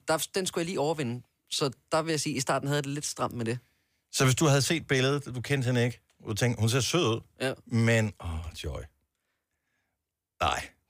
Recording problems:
none

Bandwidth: 15 kHz